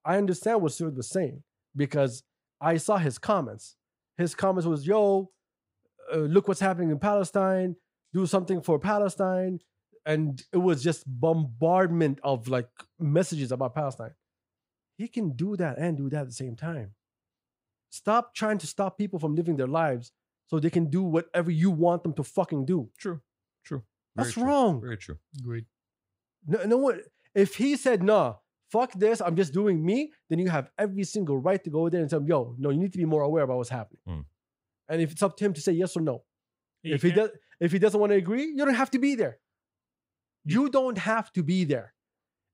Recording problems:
none

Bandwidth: 15.5 kHz